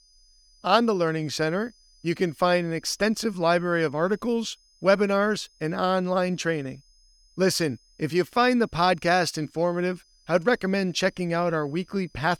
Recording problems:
high-pitched whine; faint; throughout; 5 kHz, 35 dB below the speech

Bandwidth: 17.5 kHz